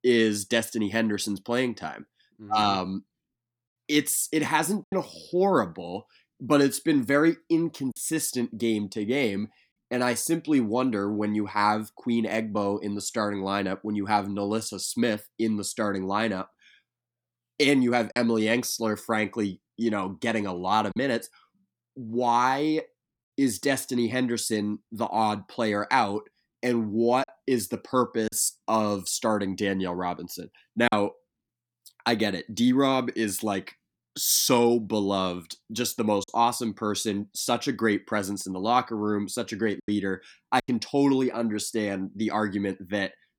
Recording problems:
choppy; occasionally; 2% of the speech affected

